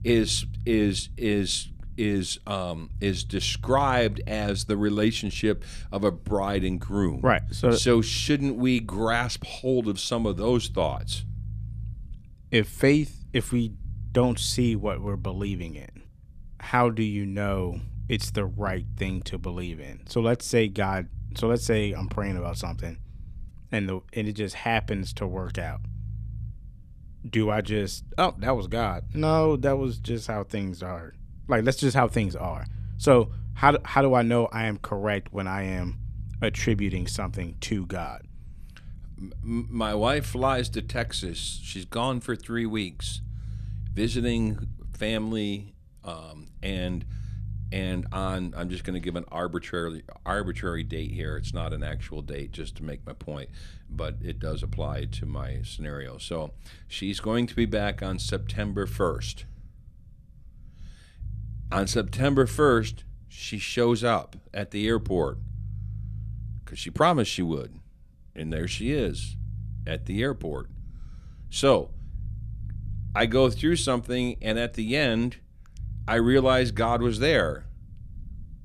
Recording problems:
low rumble; faint; throughout; 25 dB below the speech

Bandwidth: 14.5 kHz